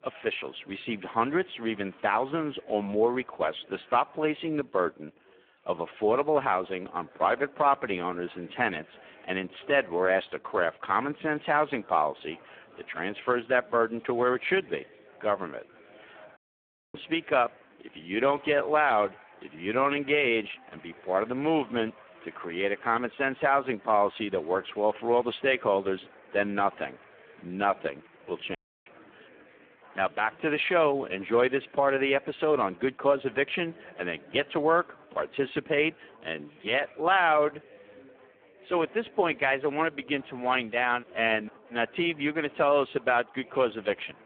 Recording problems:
phone-call audio; poor line
chatter from many people; faint; throughout; 25 dB below the speech
audio cutting out; at 16 s for 0.5 s and at 29 s

